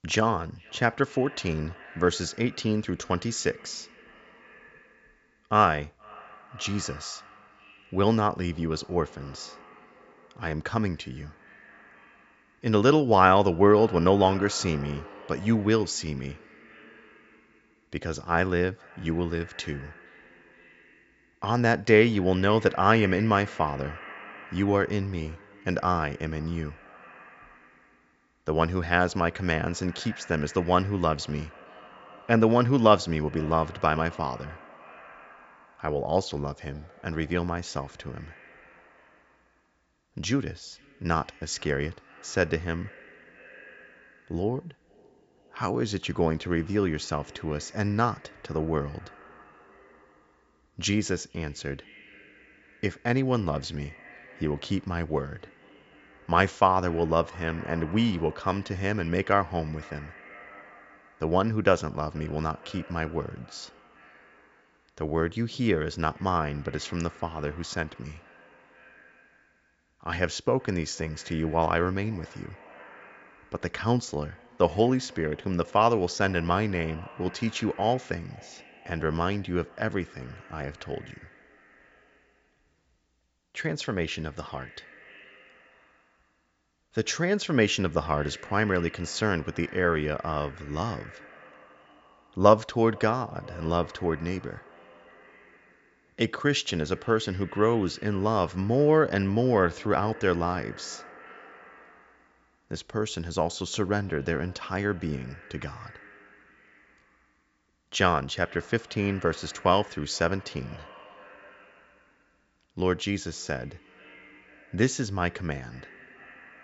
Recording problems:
high frequencies cut off; noticeable; nothing above 8 kHz
echo of what is said; faint; throughout; 470 ms later, 20 dB below the speech

